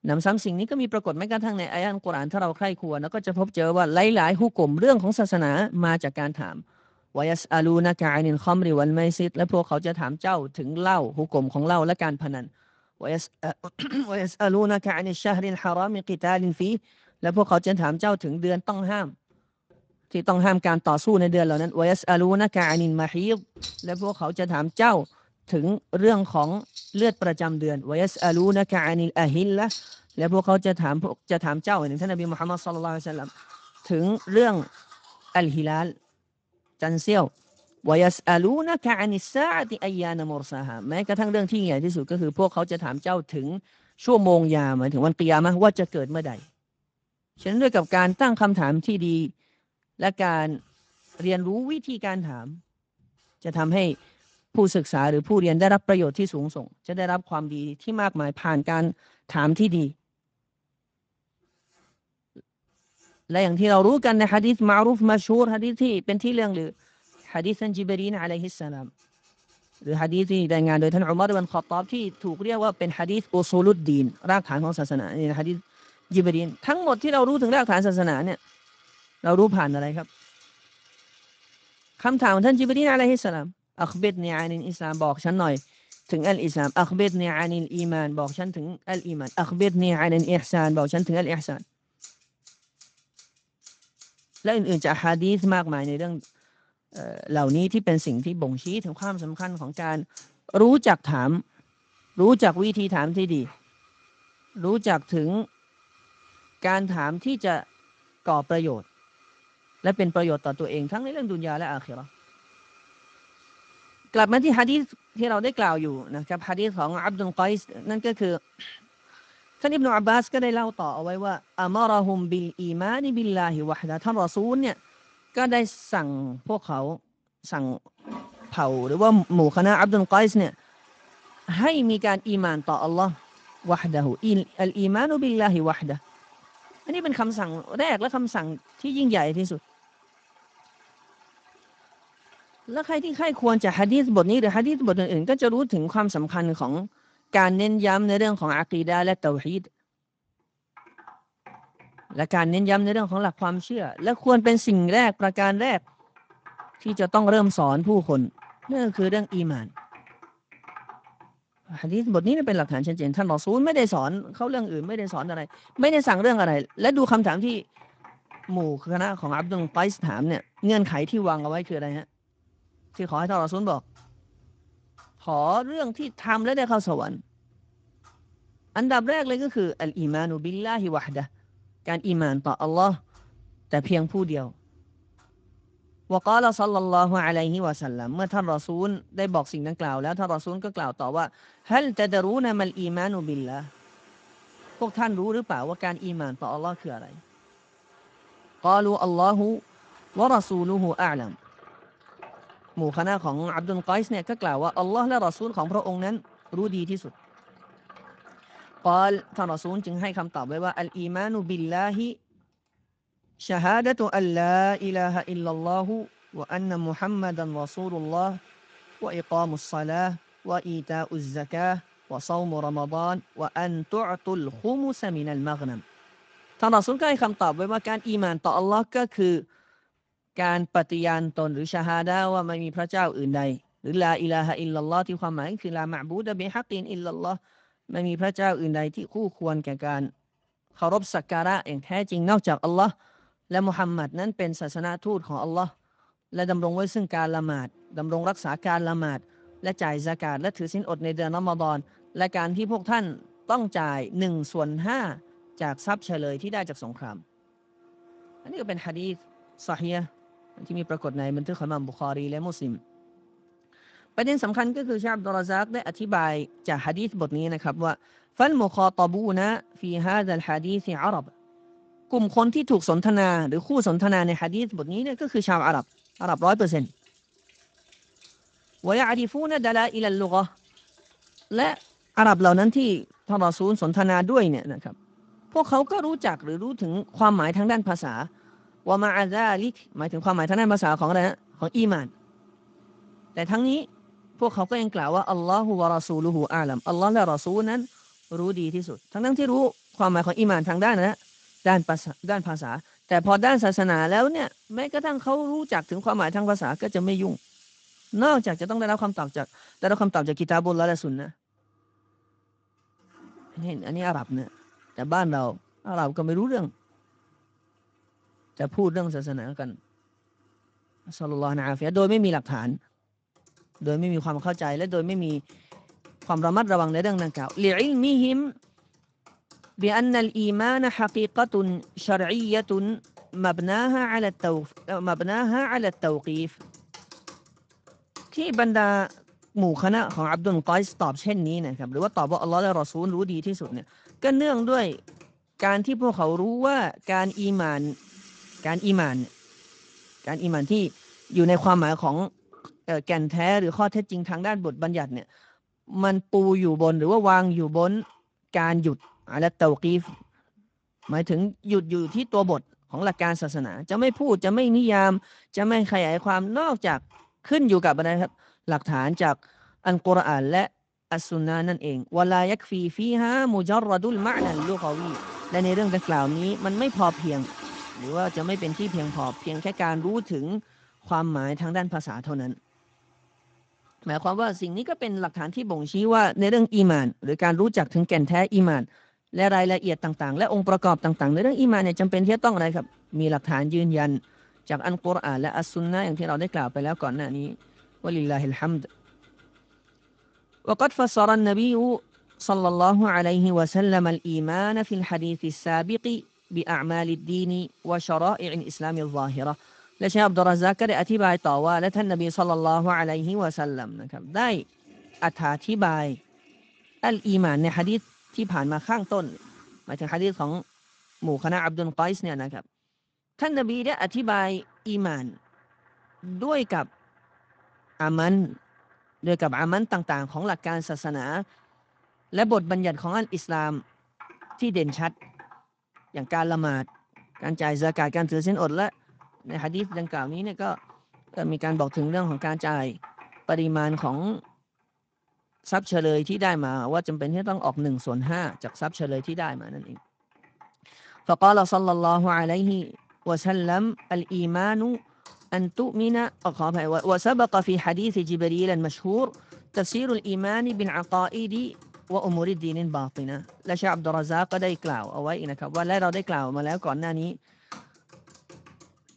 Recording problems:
garbled, watery; slightly; nothing above 7.5 kHz
household noises; faint; throughout; 25 dB below the speech

